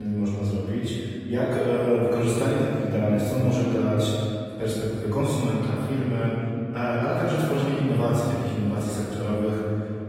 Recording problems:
room echo; strong; dies away in 2.7 s
off-mic speech; far
garbled, watery; slightly; nothing above 15.5 kHz
abrupt cut into speech; at the start

